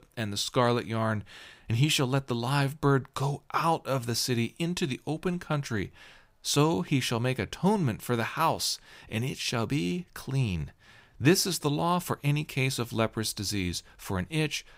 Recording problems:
none

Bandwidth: 15.5 kHz